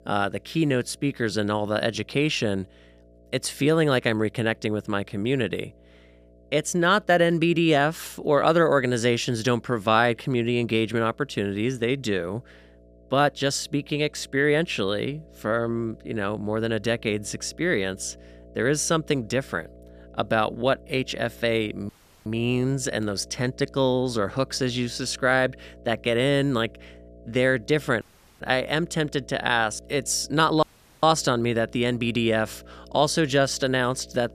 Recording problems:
electrical hum; faint; throughout; 60 Hz, 30 dB below the speech
audio cutting out; at 22 s, at 28 s and at 31 s

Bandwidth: 14.5 kHz